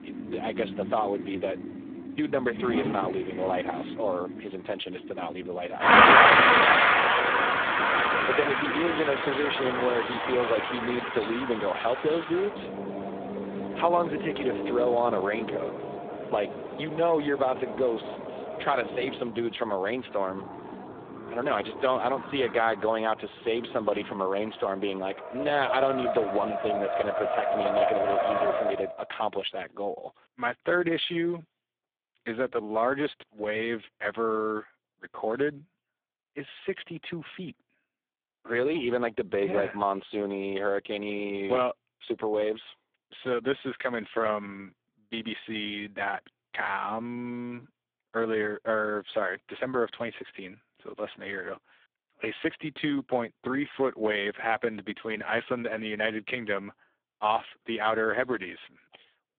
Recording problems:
phone-call audio; poor line
traffic noise; very loud; until 29 s; 5 dB above the speech

